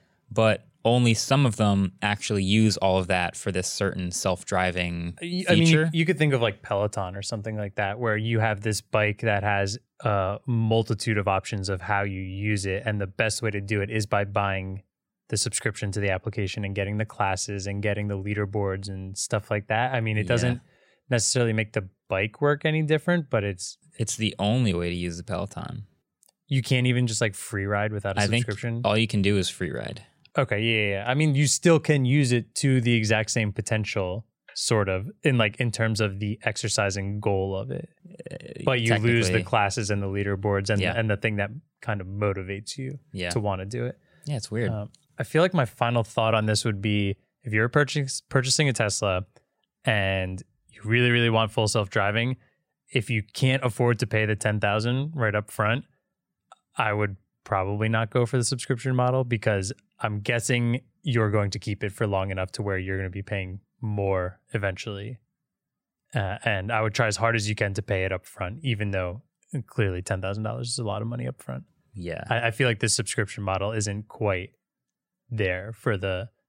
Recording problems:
none

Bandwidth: 16 kHz